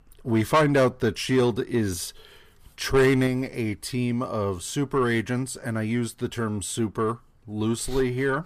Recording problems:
distortion; slight; 10 dB below the speech

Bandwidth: 14.5 kHz